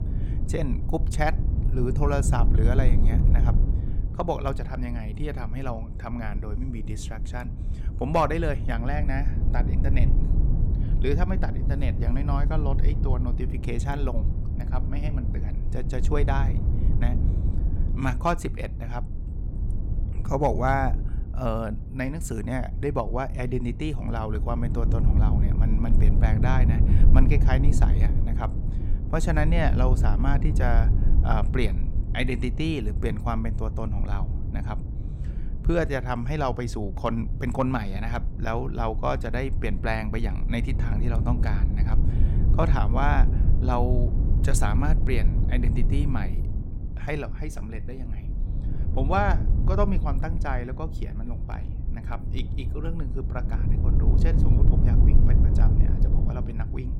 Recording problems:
low rumble; loud; throughout; 10 dB below the speech

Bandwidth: 17.5 kHz